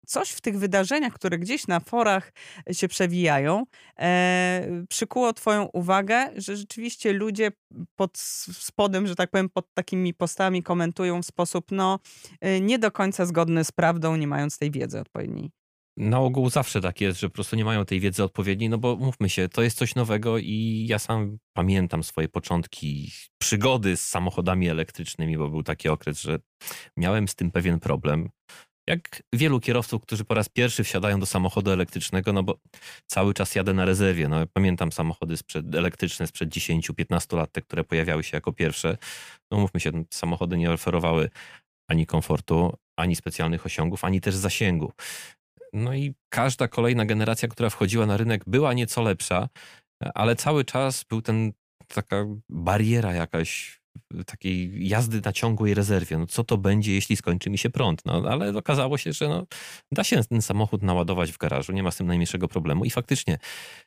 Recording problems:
none

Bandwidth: 15 kHz